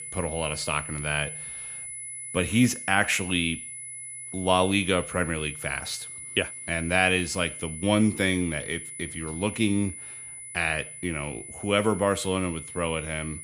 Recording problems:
high-pitched whine; loud; throughout; 10 kHz, 9 dB below the speech

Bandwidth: 14.5 kHz